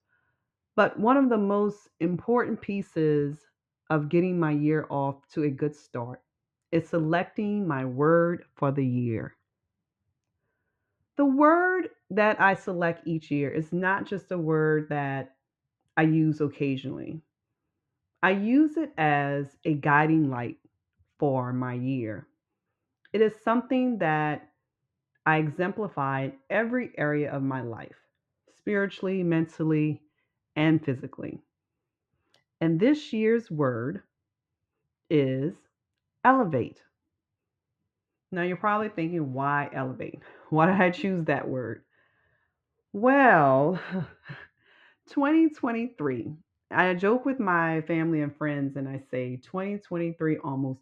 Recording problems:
muffled; very; fading above 2 kHz

